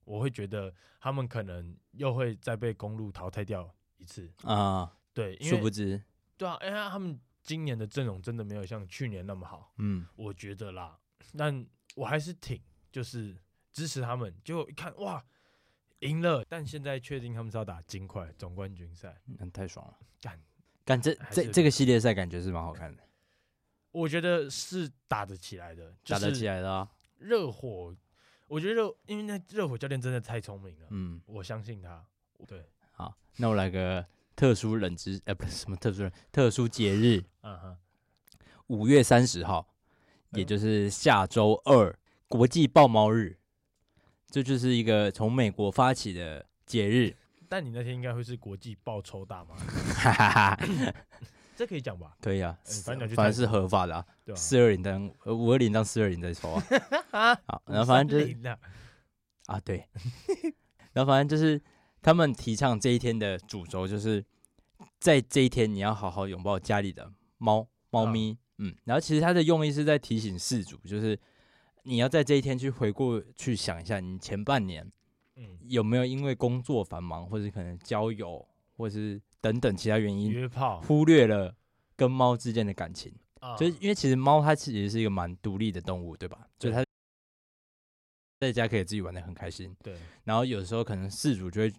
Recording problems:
audio cutting out; at 1:27 for 1.5 s

